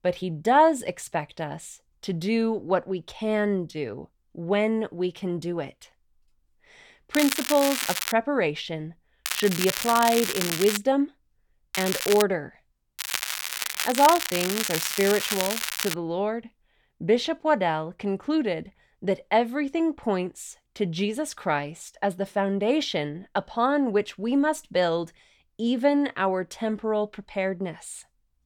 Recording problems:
crackling; loud; 4 times, first at 7 s; 2 dB below the speech

